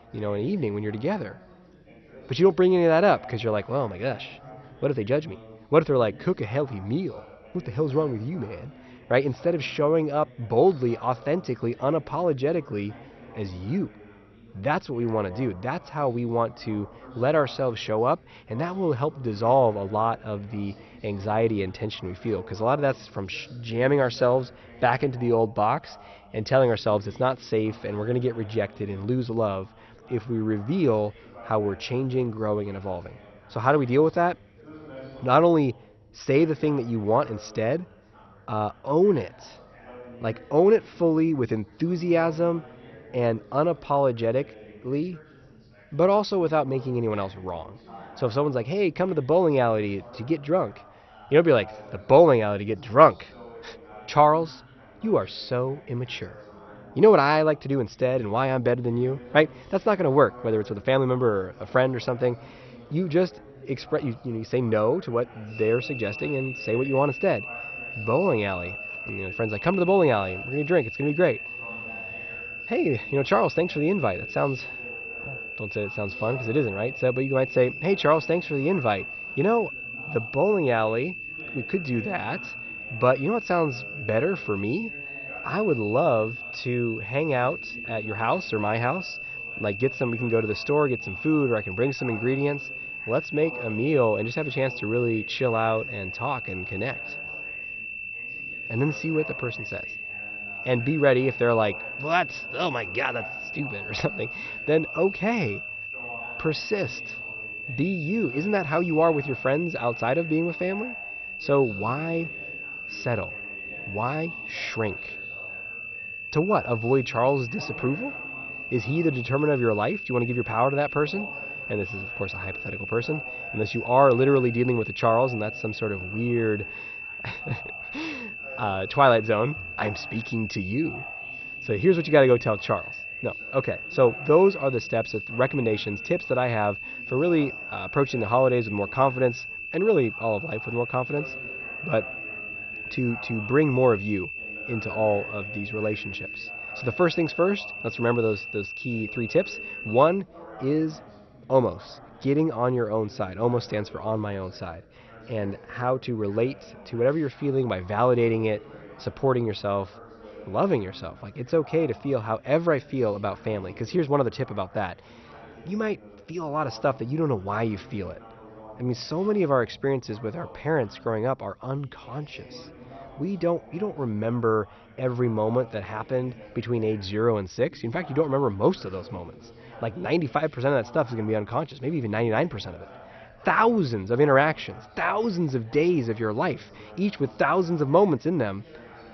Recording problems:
garbled, watery; slightly; nothing above 6 kHz
high-pitched whine; loud; from 1:06 to 2:30; 2.5 kHz, 8 dB below the speech
background chatter; faint; throughout; 3 voices, 20 dB below the speech

